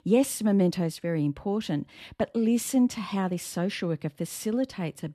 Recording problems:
none

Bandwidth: 13.5 kHz